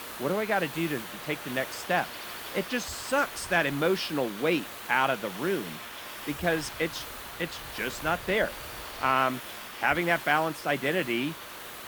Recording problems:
wind noise on the microphone; occasional gusts; from 1 to 4 s and from 6.5 to 9 s; 20 dB below the speech
hiss; noticeable; throughout; 10 dB below the speech

